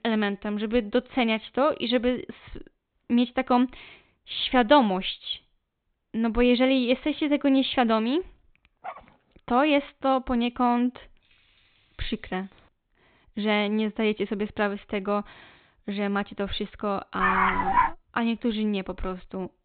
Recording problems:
high frequencies cut off; severe; nothing above 4 kHz
dog barking; faint; at 9 s; peak 15 dB below the speech
jangling keys; very faint; from 11 to 13 s; peak 35 dB below the speech
dog barking; loud; at 17 s; peak 3 dB above the speech

